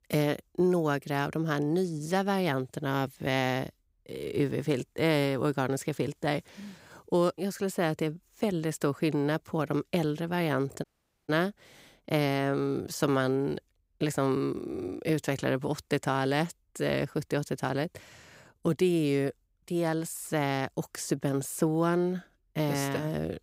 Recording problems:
audio cutting out; at 11 s

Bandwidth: 15.5 kHz